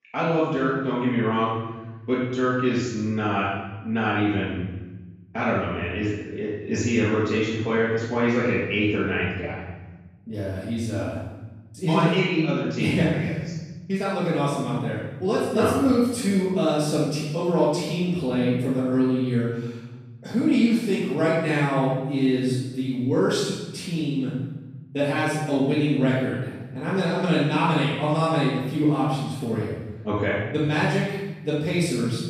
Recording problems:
room echo; strong; dies away in 1.2 s
off-mic speech; far

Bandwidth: 14.5 kHz